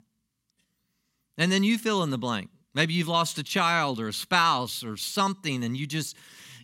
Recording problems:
none

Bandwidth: 16 kHz